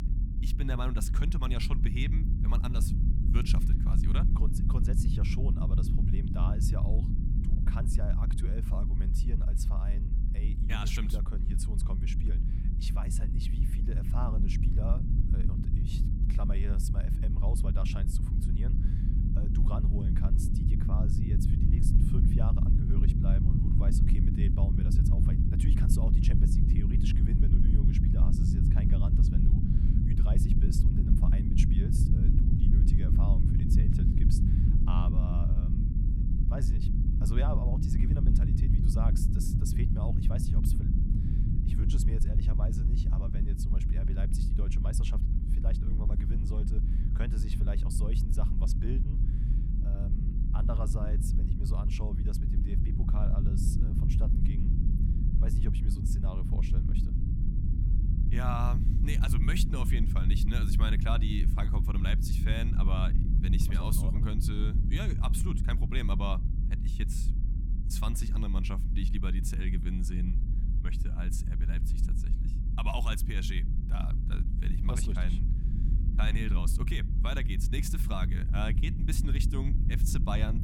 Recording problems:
low rumble; loud; throughout; 1 dB below the speech

